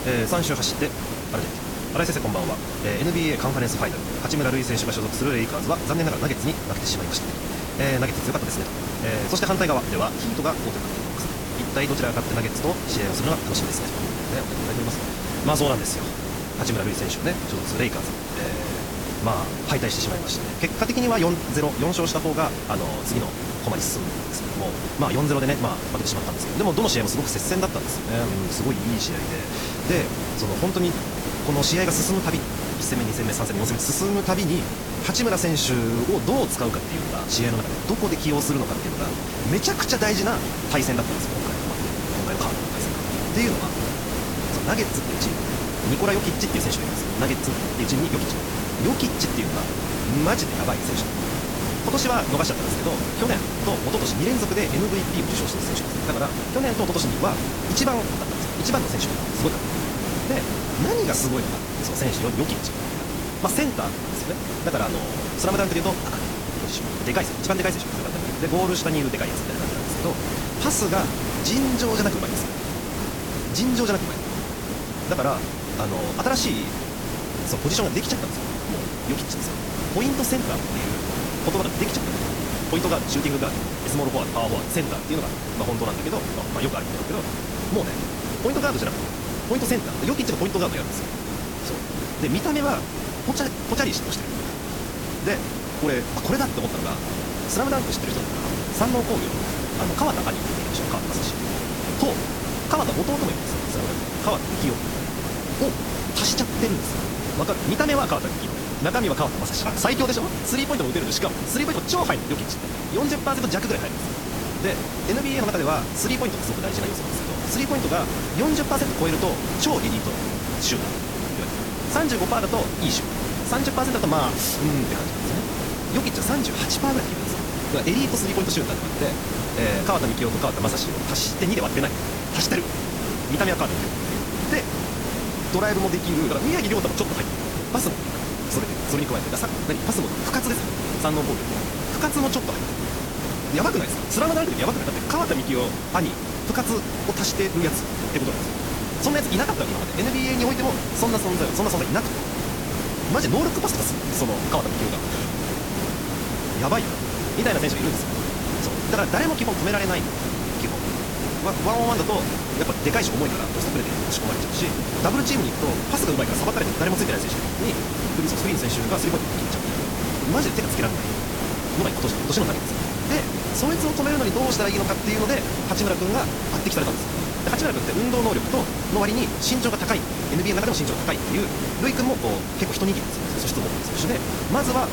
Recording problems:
wrong speed, natural pitch; too fast; 1.7 times normal speed
garbled, watery; slightly; nothing above 13.5 kHz
hiss; loud; throughout; 1 dB below the speech

